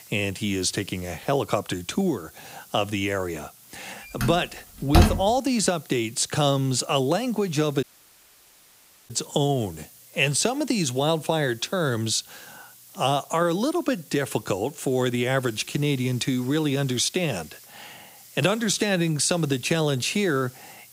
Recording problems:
hiss; faint; throughout; 20 dB below the speech
door banging; loud; at 4 s; peak 5 dB above the speech
audio cutting out; at 8 s for 1.5 s

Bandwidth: 15.5 kHz